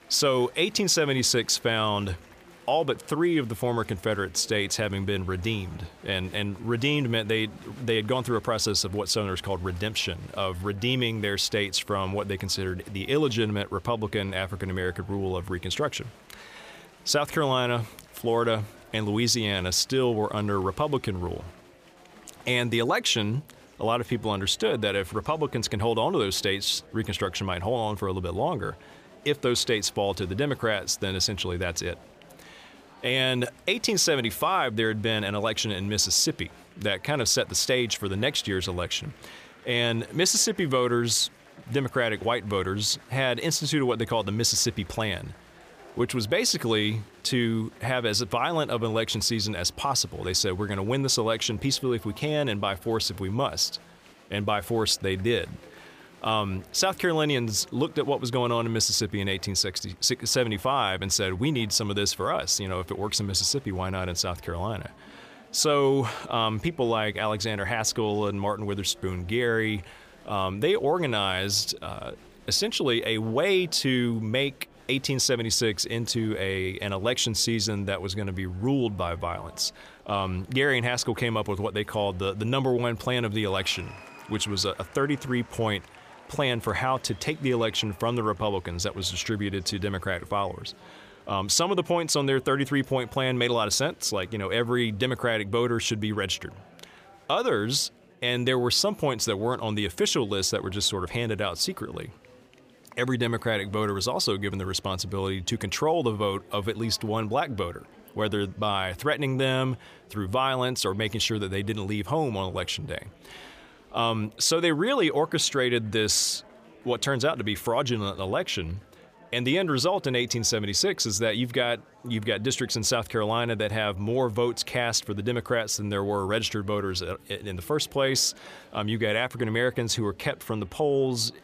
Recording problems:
chatter from many people; faint; throughout; 25 dB below the speech

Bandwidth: 15 kHz